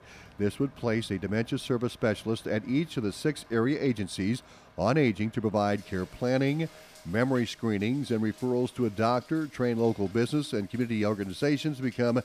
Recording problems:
rain or running water; faint; throughout; 25 dB below the speech

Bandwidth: 15 kHz